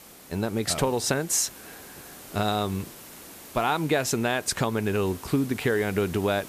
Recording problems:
hiss; noticeable; throughout; 15 dB below the speech

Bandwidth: 14.5 kHz